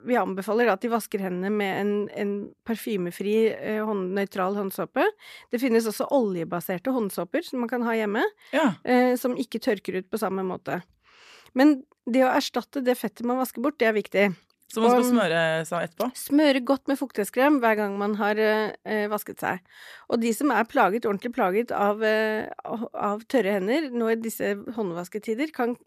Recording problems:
none

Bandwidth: 14.5 kHz